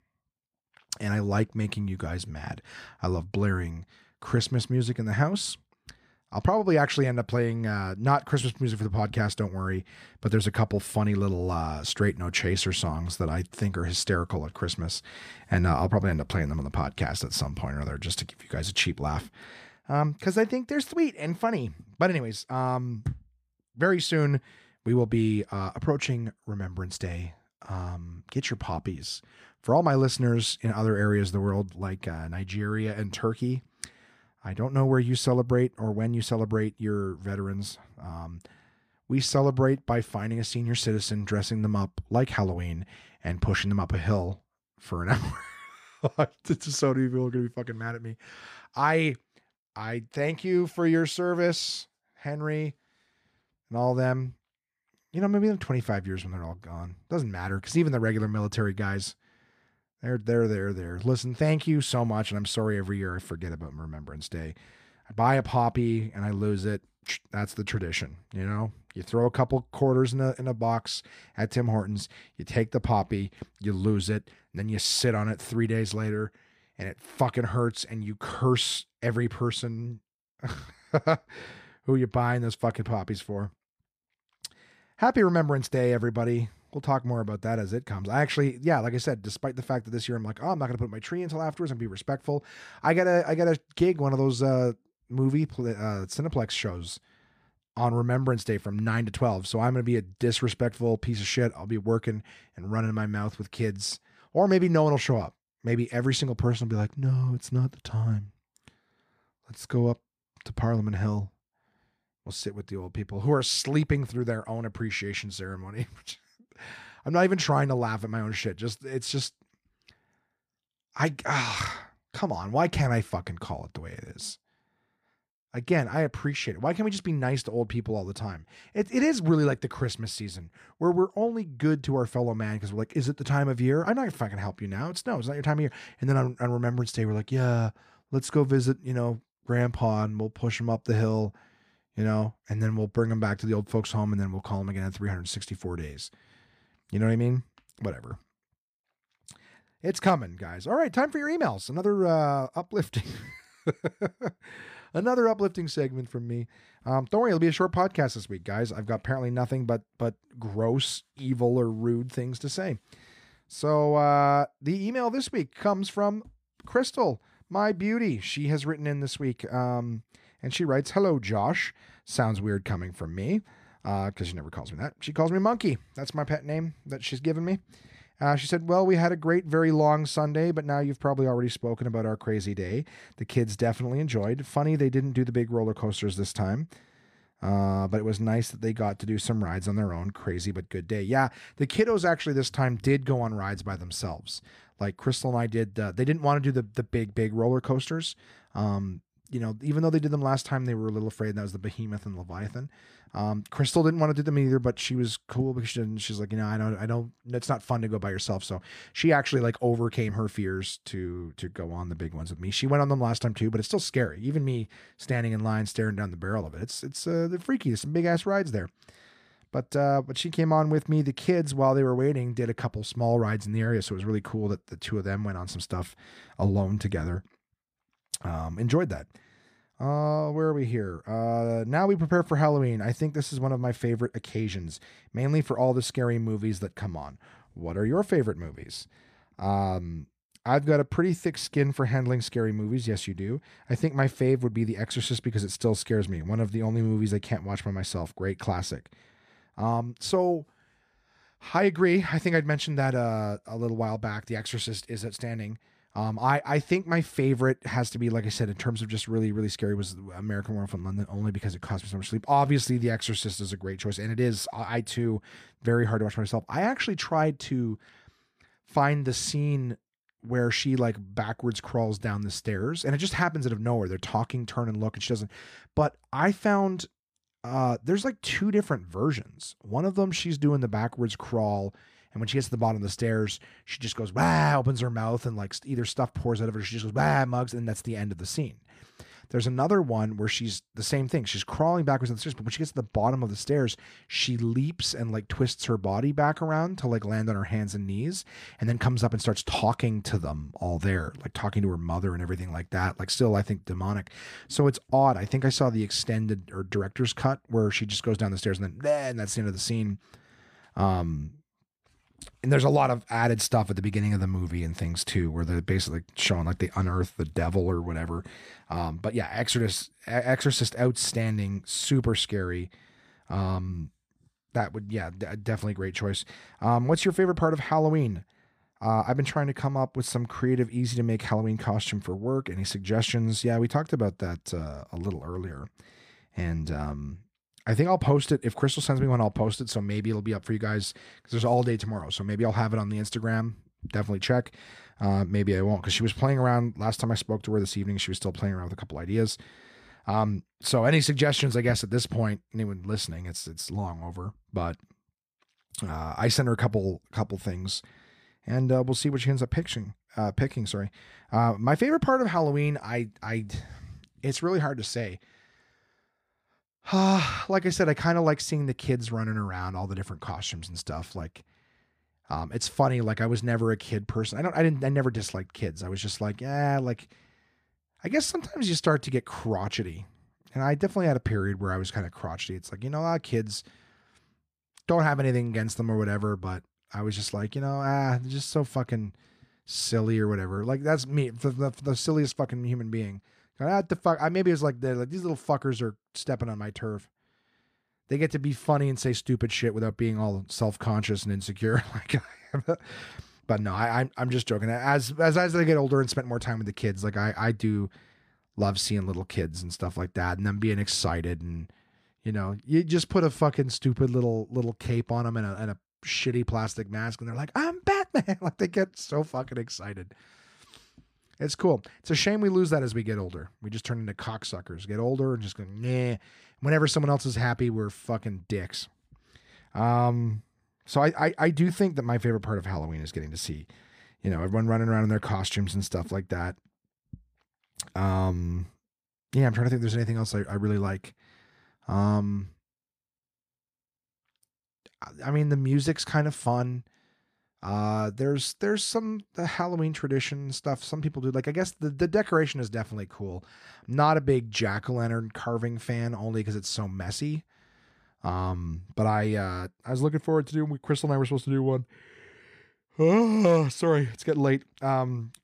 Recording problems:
none

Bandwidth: 15 kHz